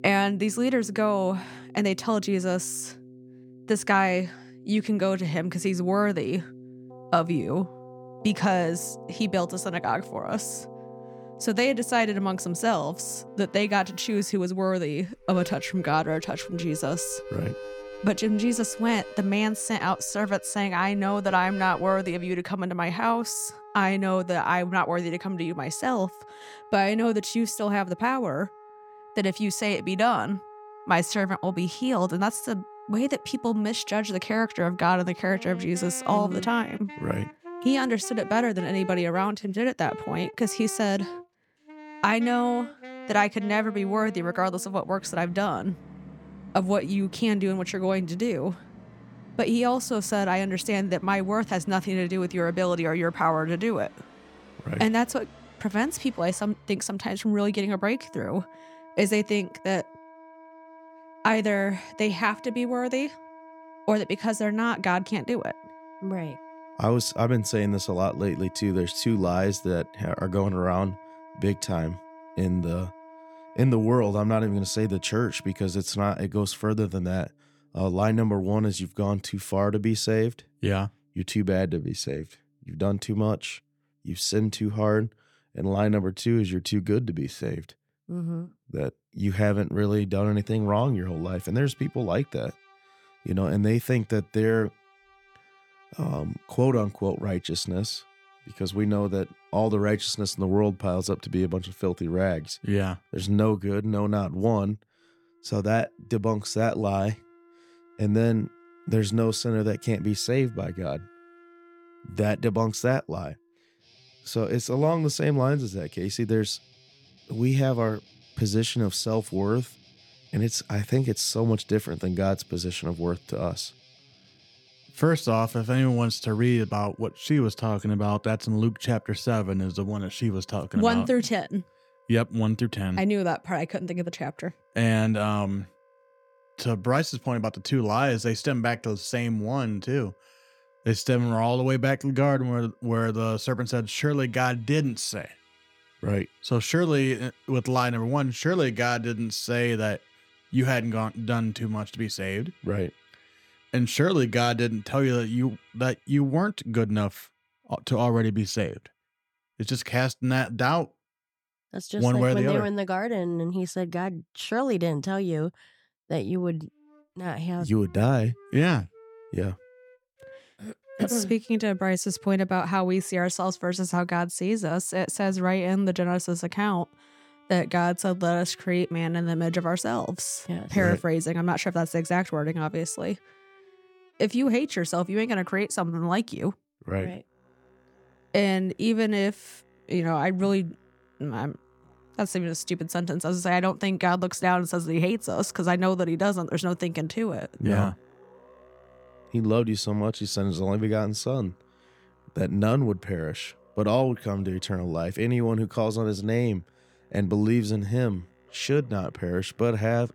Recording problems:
background music; faint; throughout; 20 dB below the speech

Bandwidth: 17.5 kHz